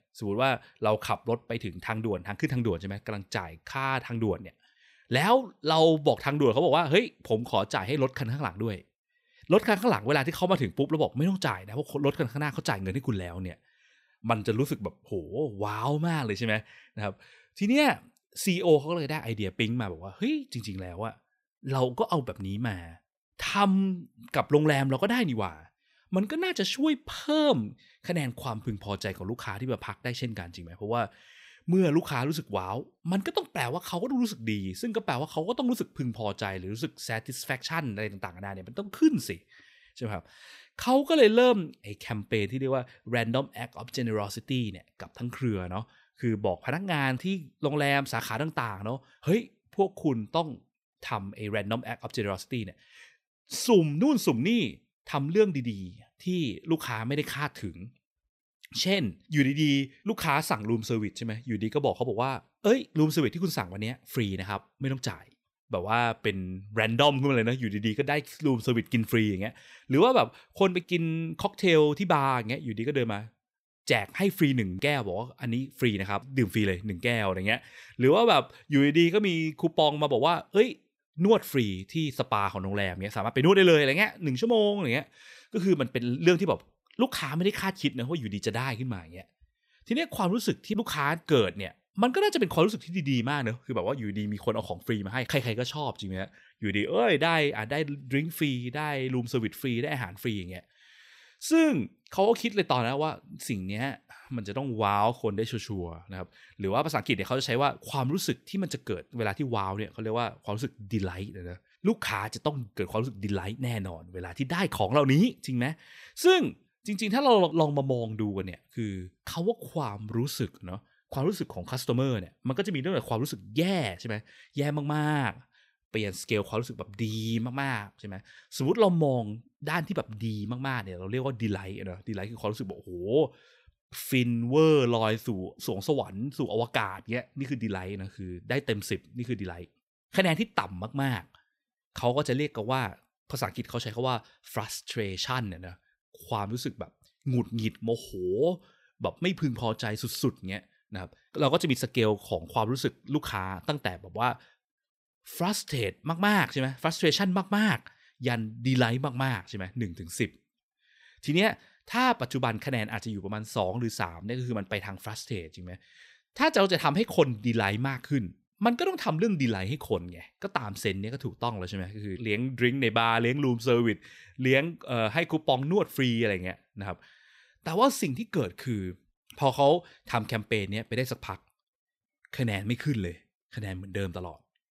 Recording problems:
none

